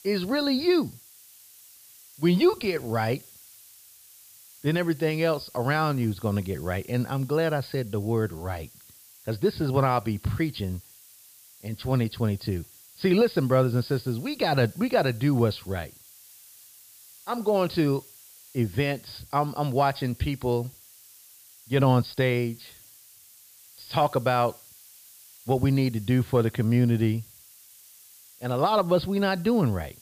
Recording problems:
high frequencies cut off; severe; nothing above 5 kHz
hiss; faint; throughout; 25 dB below the speech

